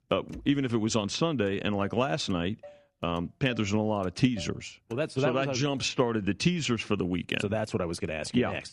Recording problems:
traffic noise; faint; throughout; 25 dB below the speech

